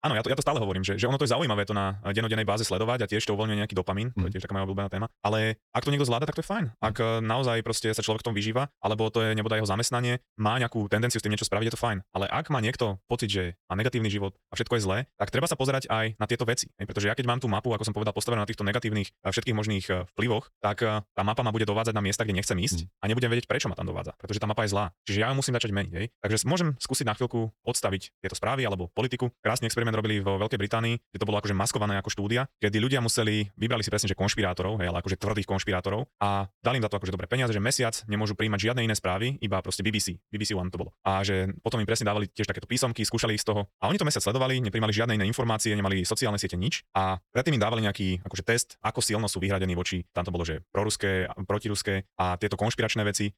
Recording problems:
wrong speed, natural pitch; too fast; 1.5 times normal speed

